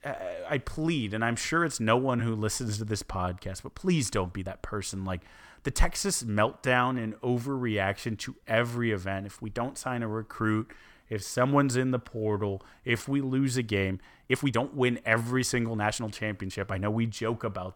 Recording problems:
uneven, jittery; strongly; from 0.5 to 17 s

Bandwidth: 17 kHz